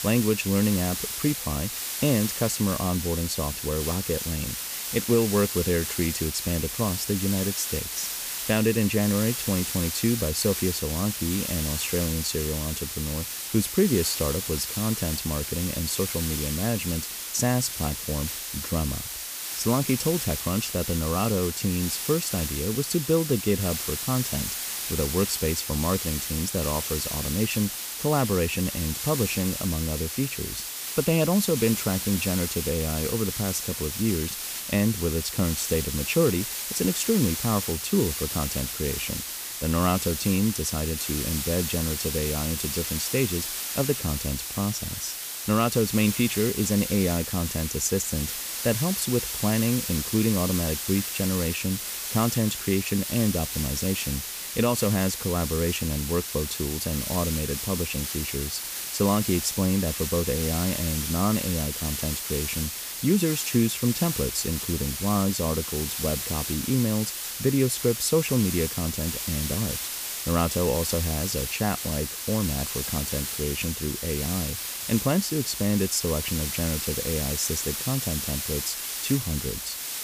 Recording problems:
hiss; loud; throughout; 3 dB below the speech

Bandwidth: 15 kHz